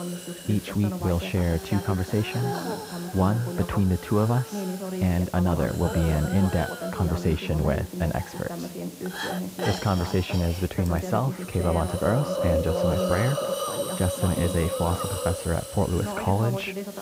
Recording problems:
muffled; very; fading above 2 kHz
voice in the background; loud; throughout; 9 dB below the speech
hiss; loud; throughout; 7 dB below the speech

